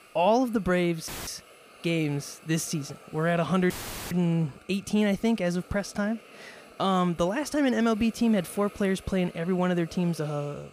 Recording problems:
hiss; faint; throughout; 25 dB below the speech
audio cutting out; filled with static; at 1 s and at 3.5 s

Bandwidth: 15 kHz